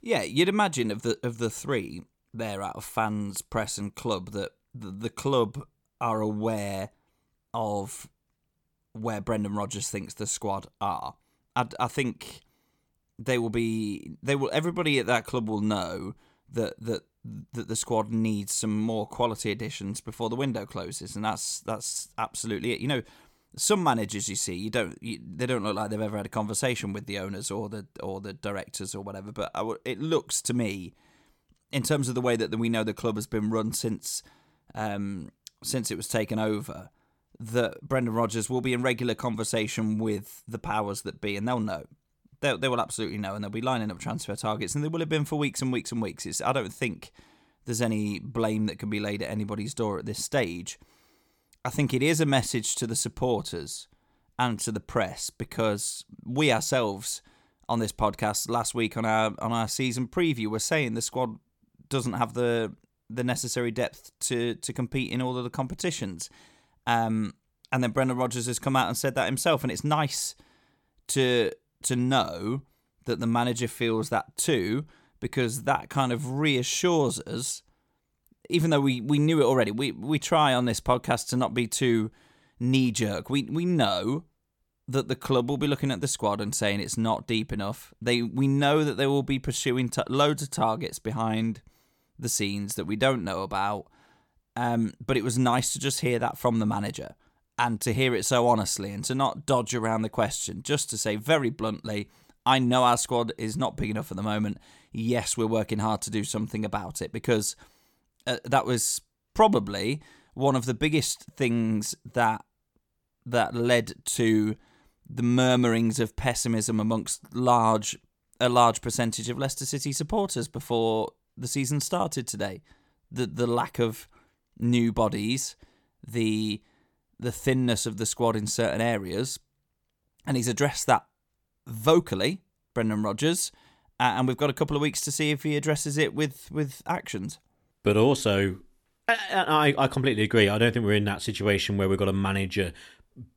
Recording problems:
none

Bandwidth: 18 kHz